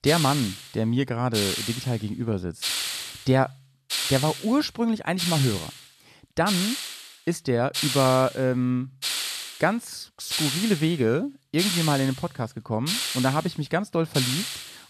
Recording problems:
hiss; loud; throughout; 3 dB below the speech

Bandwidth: 13.5 kHz